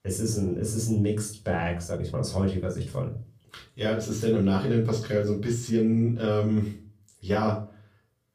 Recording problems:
off-mic speech; far
room echo; slight; dies away in 0.3 s
uneven, jittery; slightly; from 1.5 to 7.5 s

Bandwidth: 15 kHz